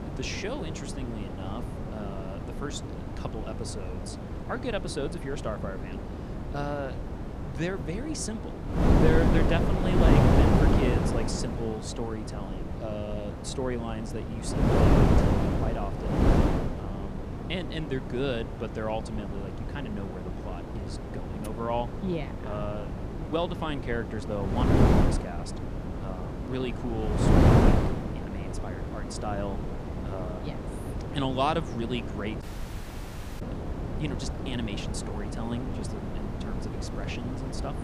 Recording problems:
wind noise on the microphone; heavy; 1 dB above the speech
audio cutting out; at 32 s for 1 s

